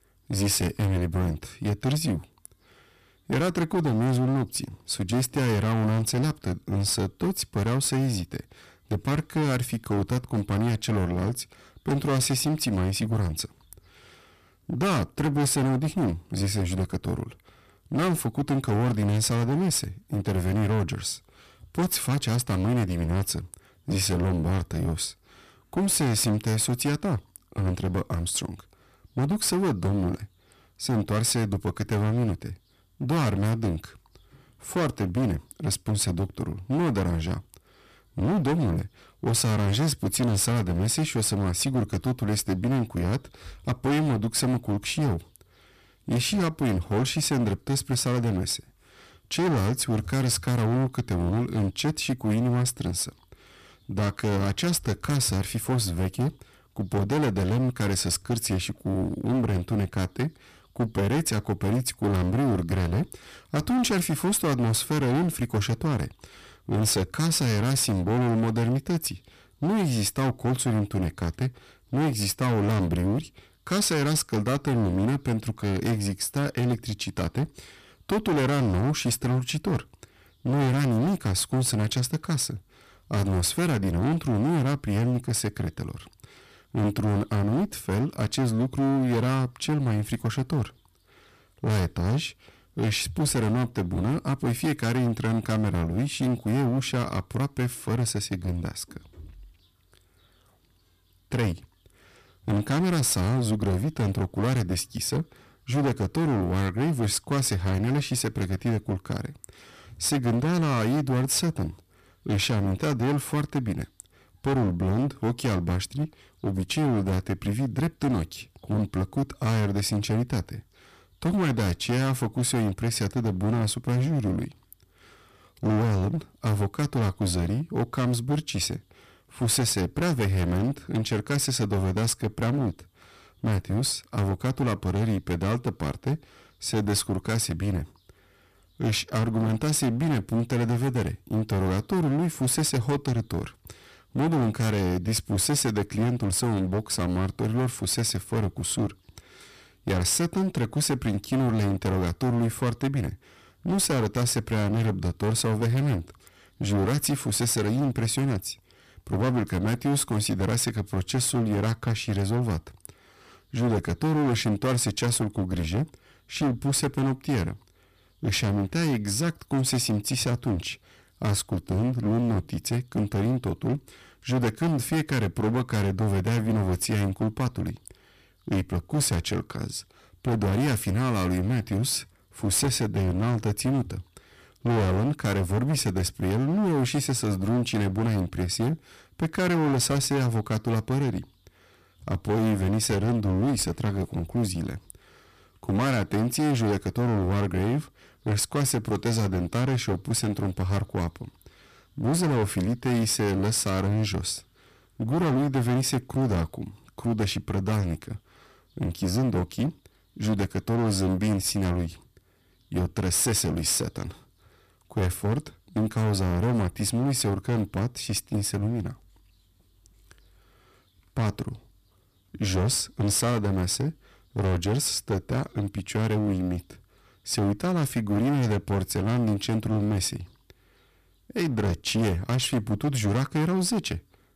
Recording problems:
distortion; heavy; 18% of the sound clipped

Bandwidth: 14.5 kHz